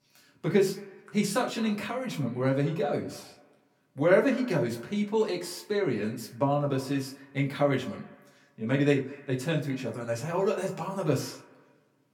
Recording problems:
off-mic speech; far
echo of what is said; faint; throughout; 210 ms later, 20 dB below the speech
room echo; very slight; dies away in 0.3 s

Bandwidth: 18 kHz